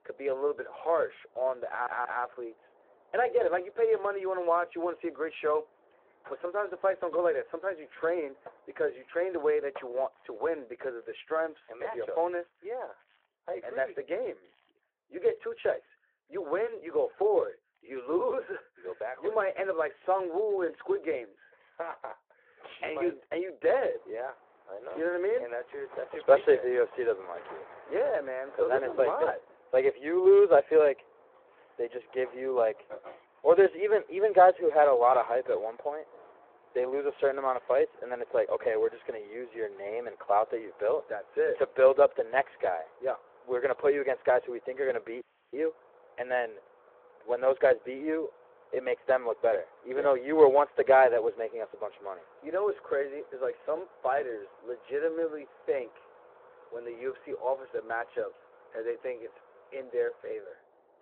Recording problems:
muffled; very; fading above 3 kHz
phone-call audio
machinery noise; faint; throughout; 25 dB below the speech
audio stuttering; at 1.5 s
audio freezing; at 45 s

